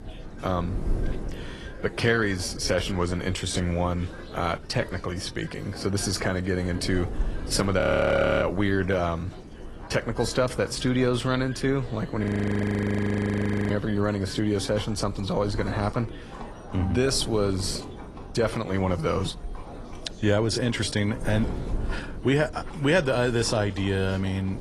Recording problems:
garbled, watery; slightly; nothing above 11.5 kHz
wind noise on the microphone; occasional gusts; 20 dB below the speech
animal sounds; faint; throughout; 25 dB below the speech
background chatter; faint; throughout; 4 voices, 20 dB below the speech
audio freezing; at 8 s for 0.5 s and at 12 s for 1.5 s

